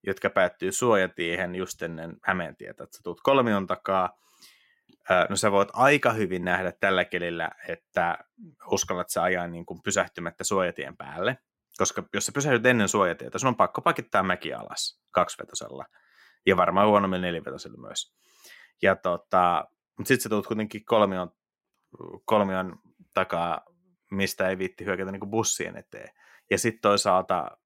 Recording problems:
none

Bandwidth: 16 kHz